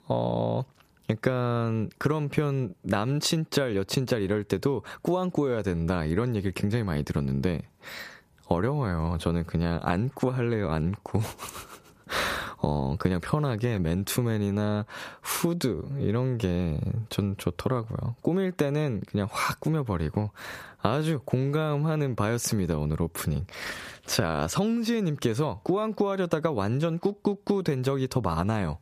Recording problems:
squashed, flat; somewhat

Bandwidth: 14.5 kHz